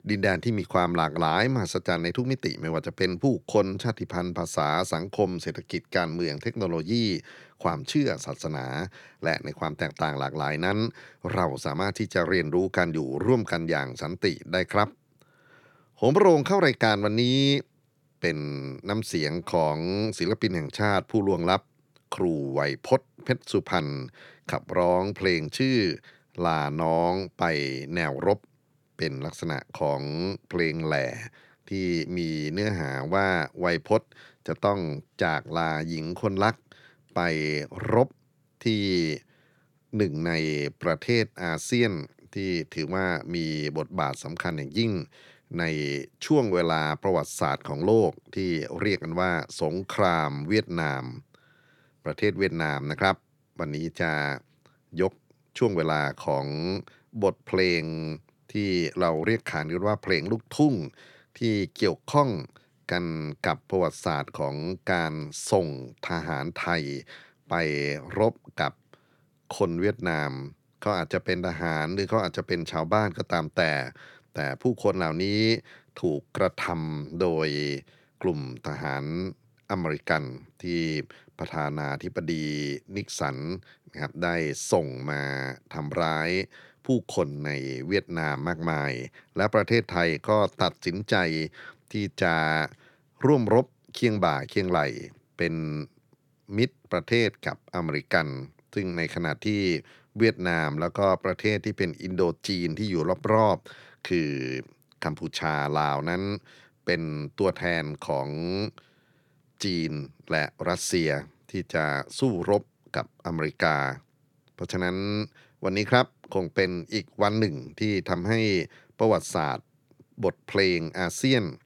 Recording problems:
none

